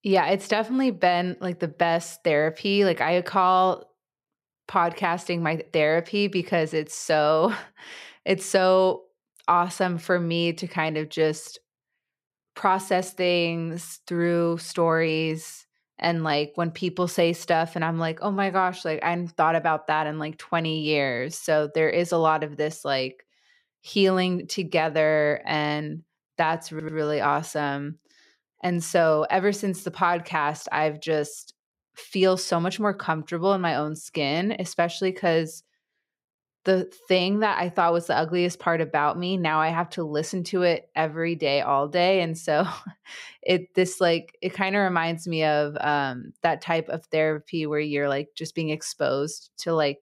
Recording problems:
audio stuttering; at 27 s

